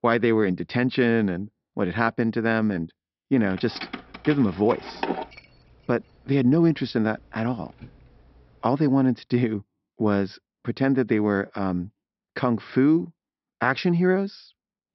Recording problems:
high frequencies cut off; noticeable; nothing above 5.5 kHz
jangling keys; noticeable; from 3.5 to 8 s; peak 6 dB below the speech

